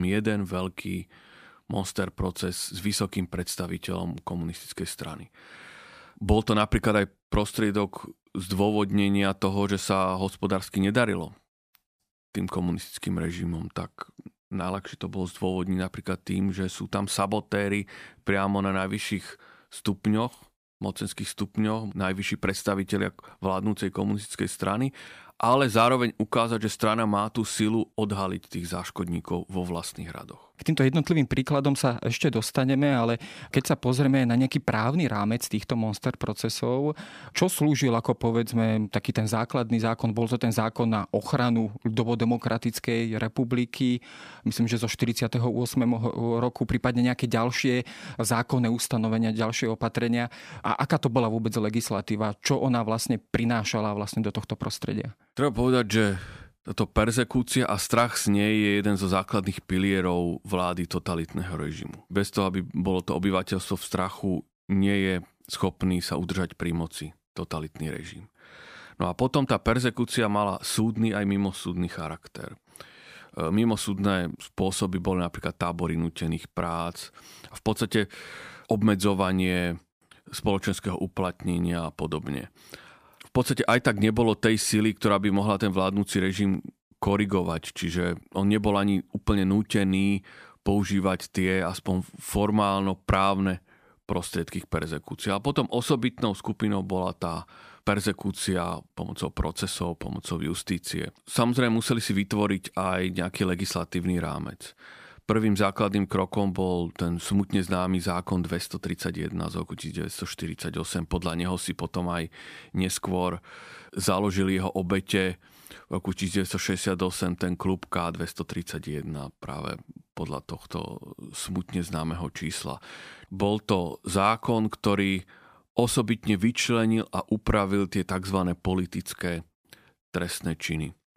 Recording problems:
abrupt cut into speech; at the start

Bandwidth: 15 kHz